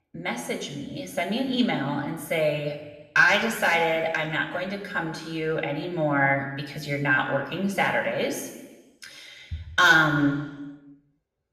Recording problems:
room echo; noticeable; dies away in 1.1 s
off-mic speech; somewhat distant

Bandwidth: 14.5 kHz